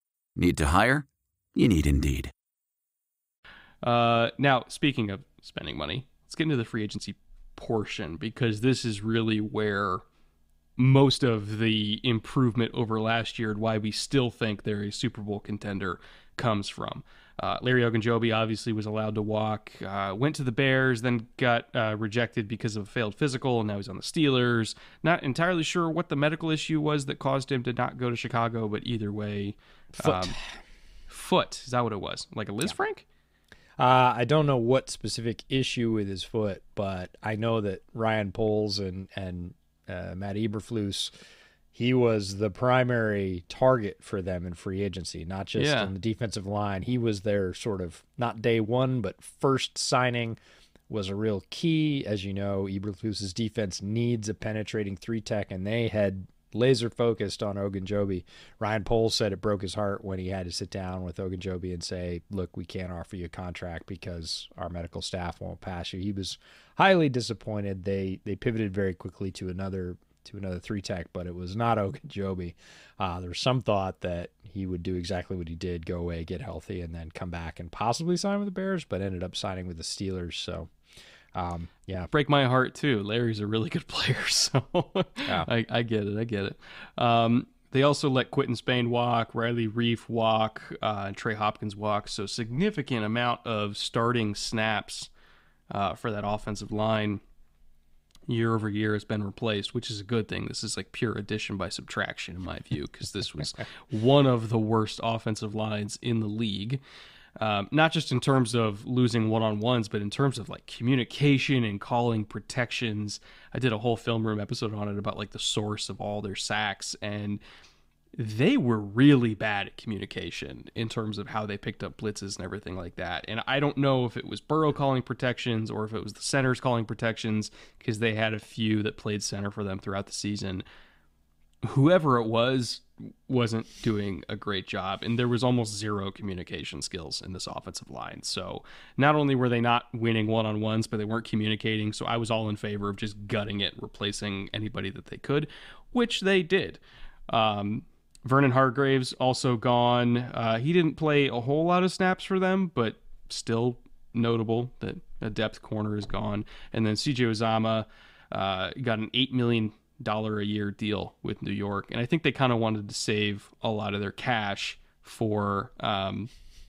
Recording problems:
uneven, jittery; strongly; from 6.5 s to 2:09

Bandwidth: 15.5 kHz